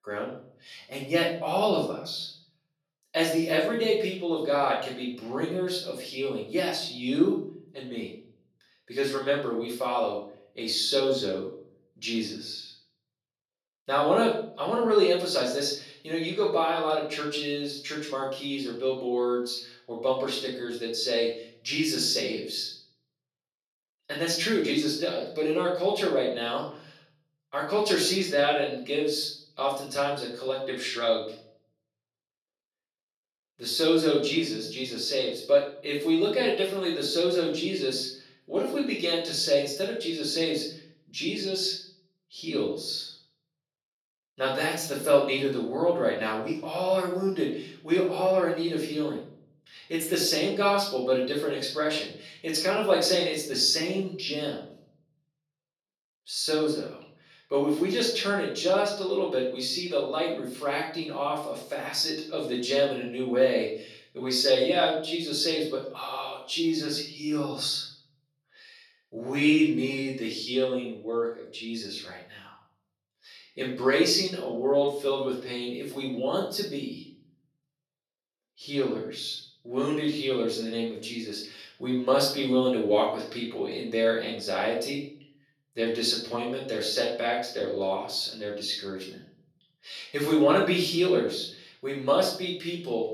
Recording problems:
off-mic speech; far
room echo; noticeable; dies away in 0.5 s
thin; somewhat; fading below 350 Hz

